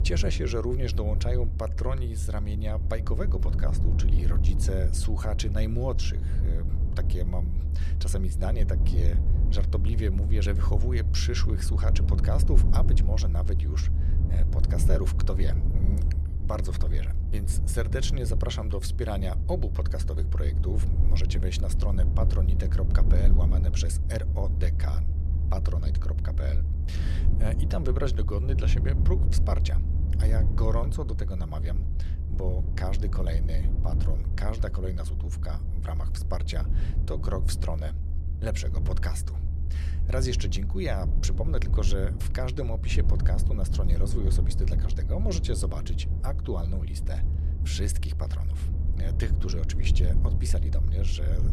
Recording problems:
low rumble; loud; throughout; 7 dB below the speech

